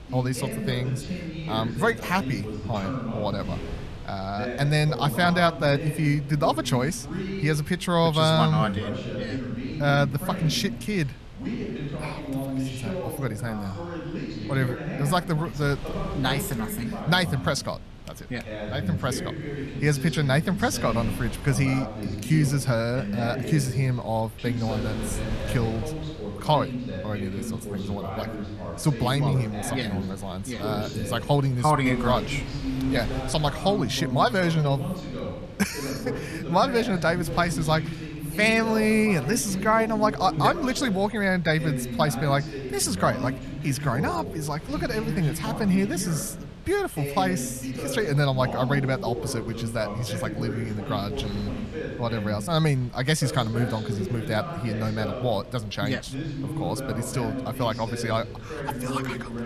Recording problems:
voice in the background; loud; throughout; 7 dB below the speech
wind noise on the microphone; occasional gusts; 20 dB below the speech

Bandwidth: 13.5 kHz